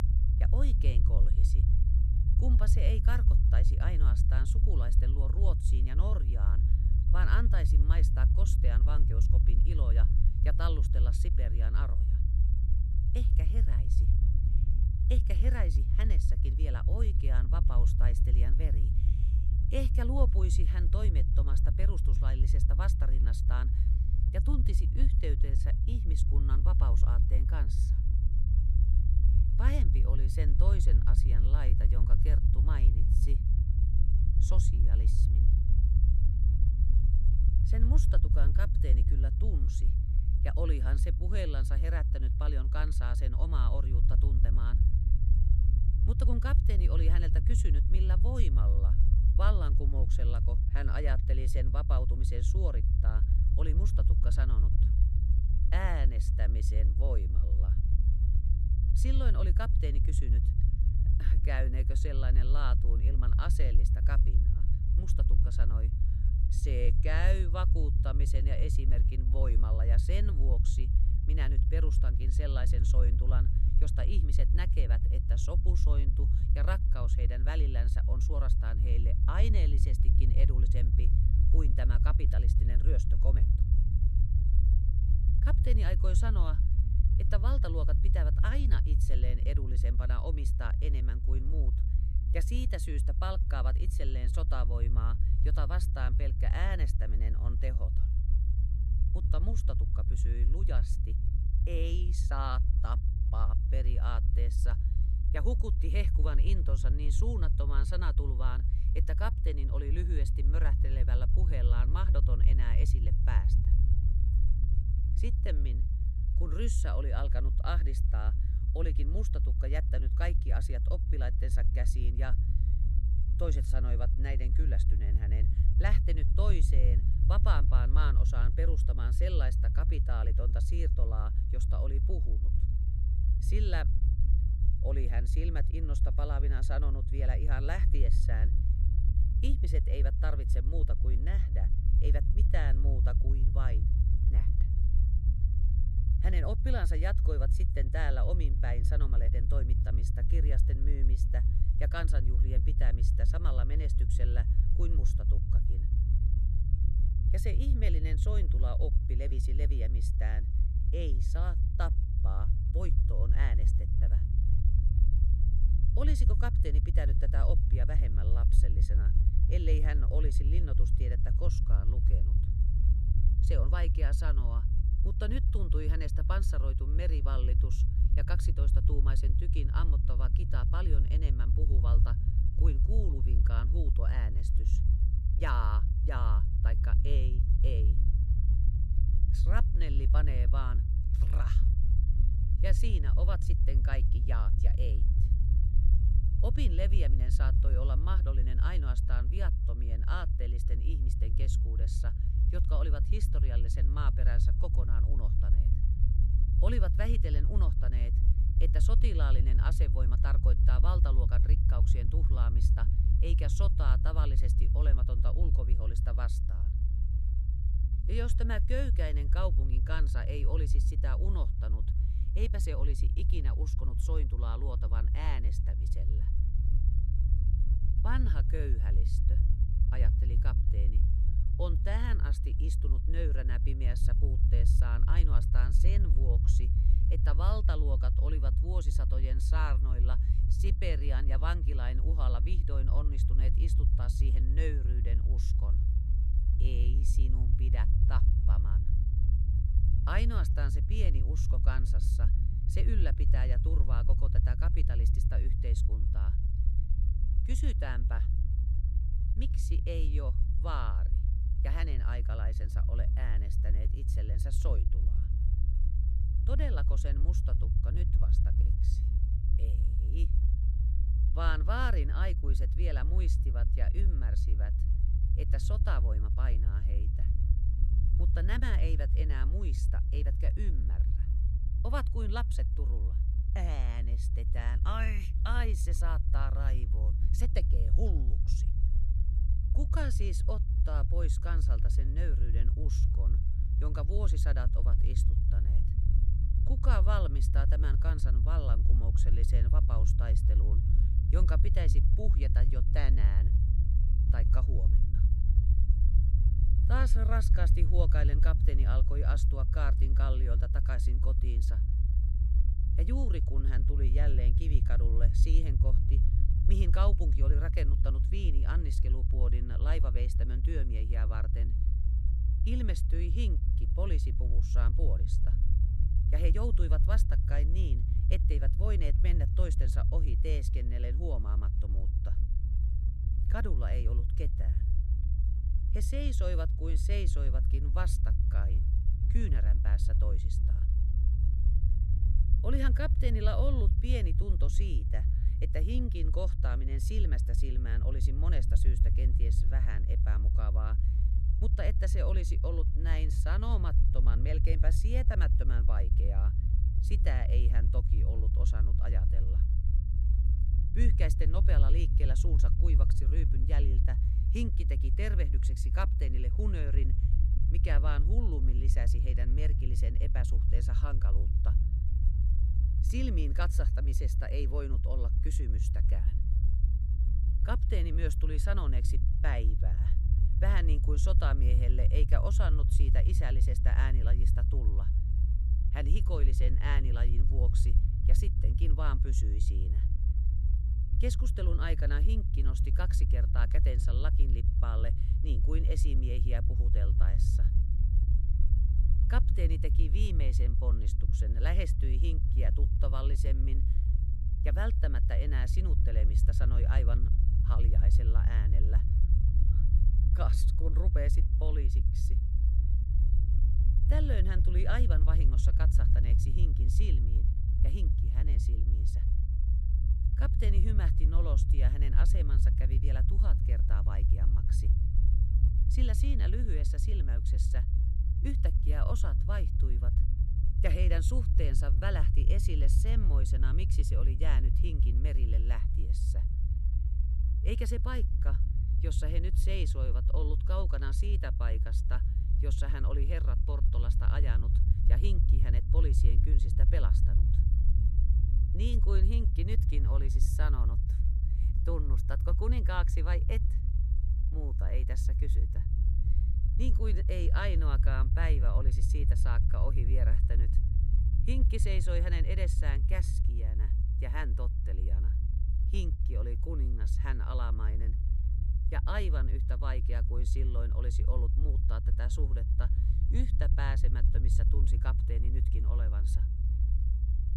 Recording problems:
low rumble; loud; throughout; 5 dB below the speech

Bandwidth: 13.5 kHz